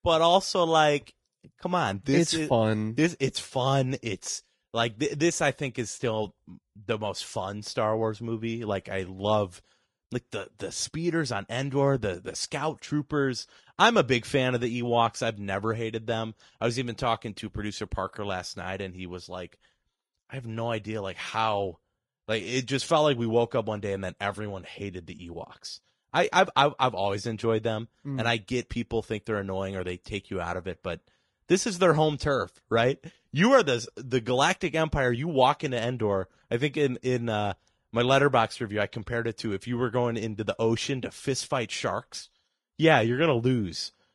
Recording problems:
garbled, watery; slightly; nothing above 10.5 kHz

